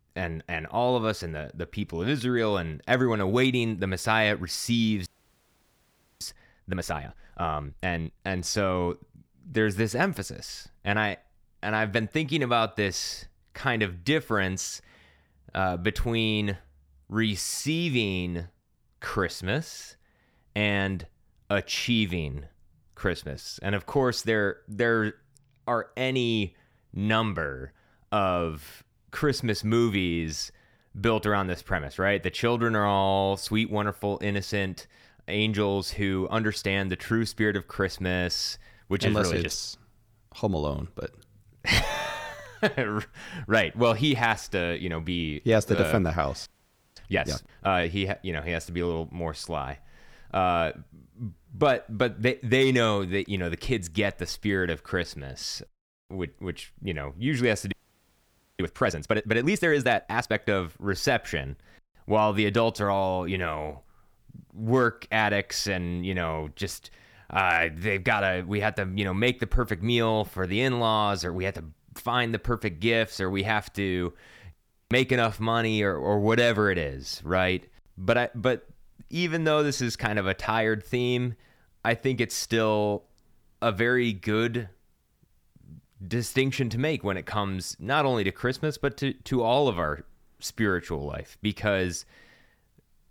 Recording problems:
audio freezing; at 5 s for 1 s, at 46 s for 0.5 s and at 58 s for 1 s

